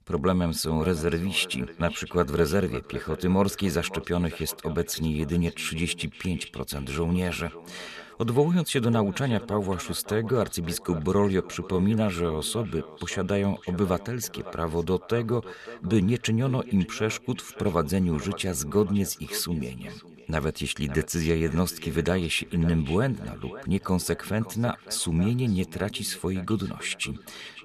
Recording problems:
echo of what is said; noticeable; throughout; 560 ms later, 15 dB below the speech

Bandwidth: 13.5 kHz